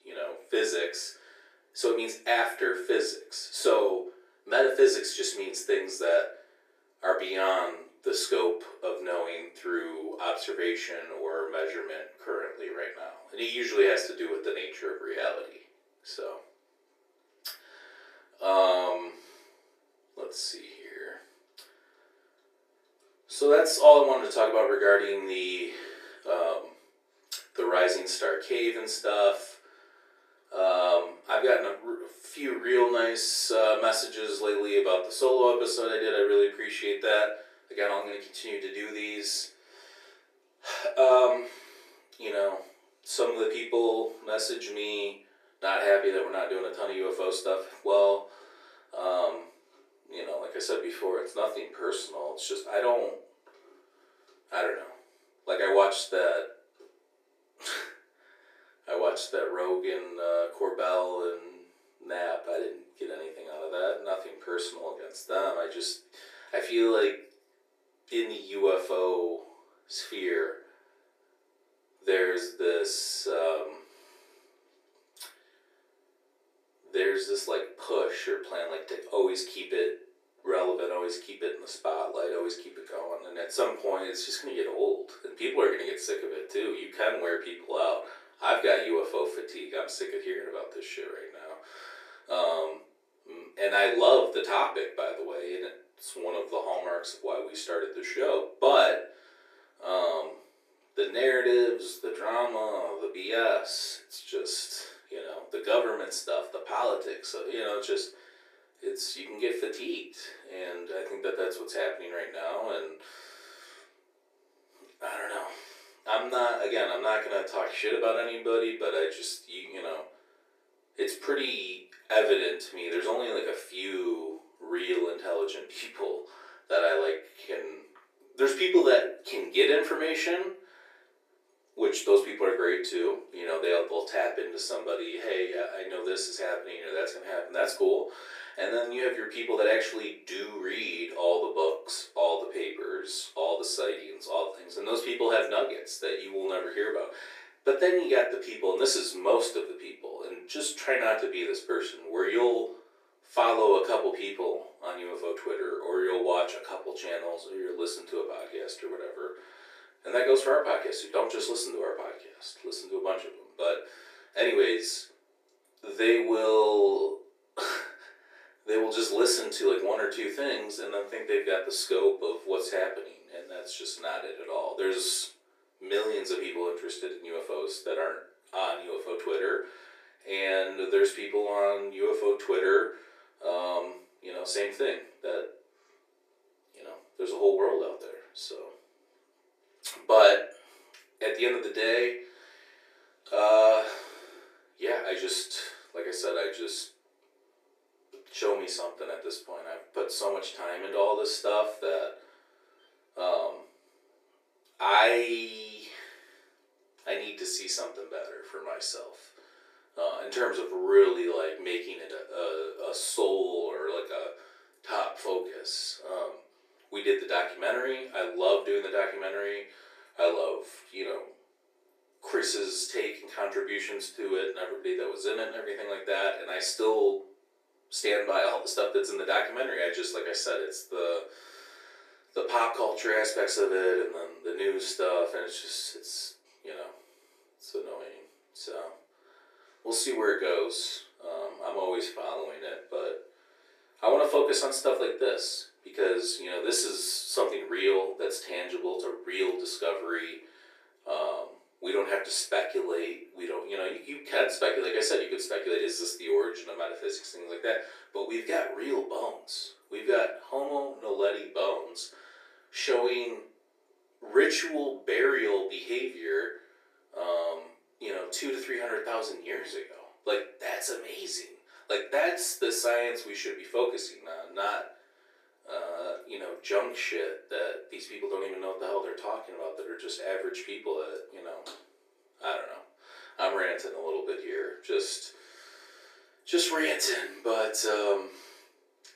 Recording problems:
off-mic speech; far
thin; very; fading below 350 Hz
room echo; slight; dies away in 0.4 s

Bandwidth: 14.5 kHz